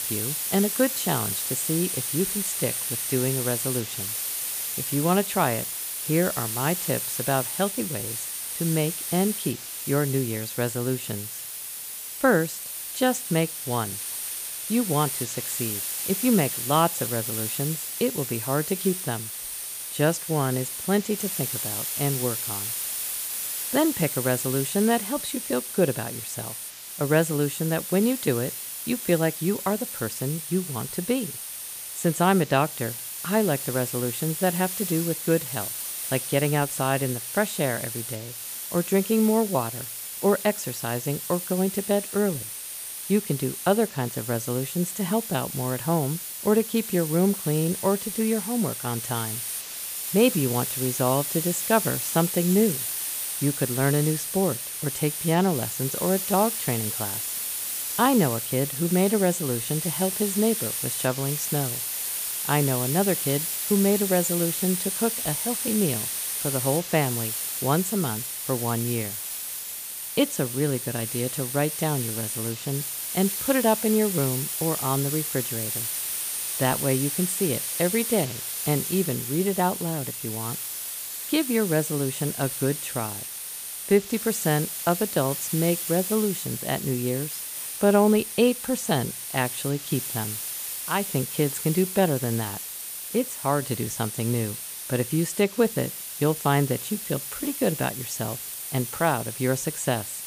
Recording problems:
hiss; loud; throughout; 3 dB below the speech

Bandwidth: 15 kHz